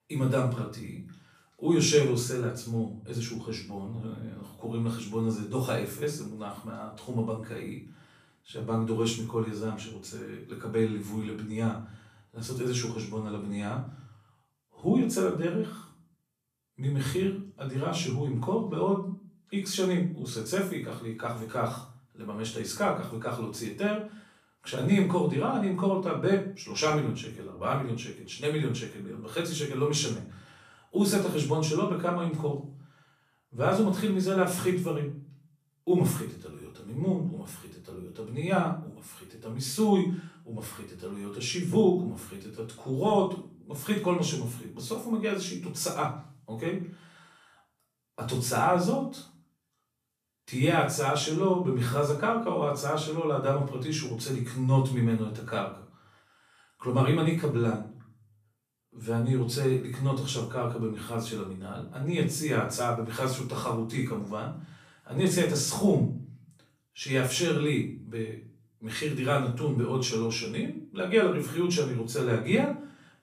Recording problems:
off-mic speech; far
room echo; slight; dies away in 0.4 s

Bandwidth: 14.5 kHz